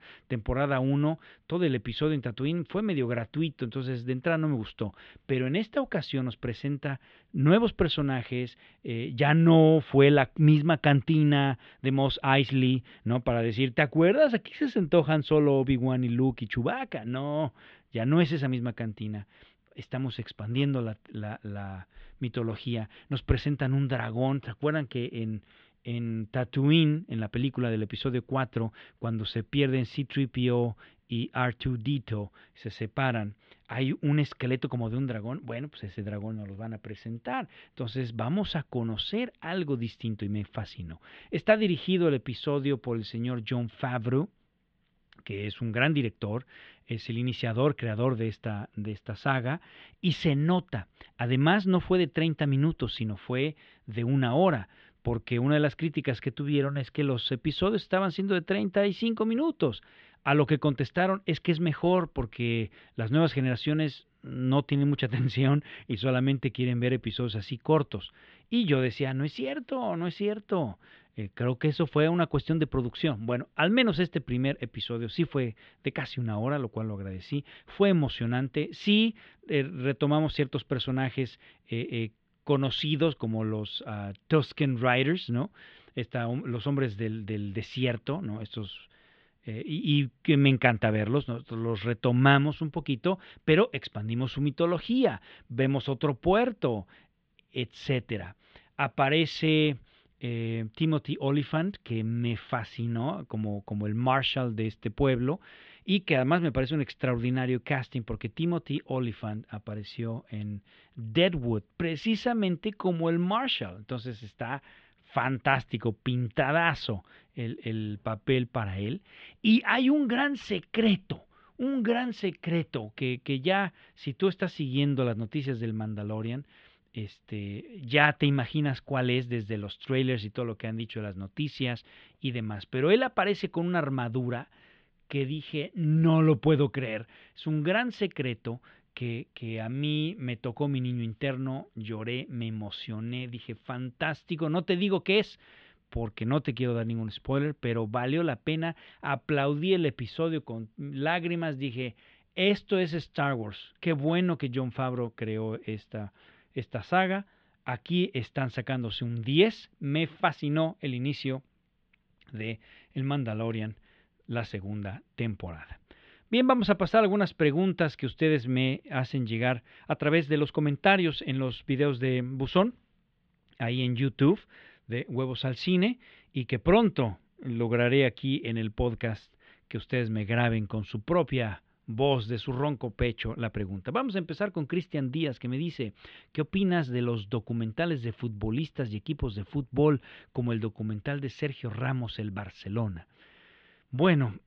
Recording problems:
muffled; very; fading above 3.5 kHz

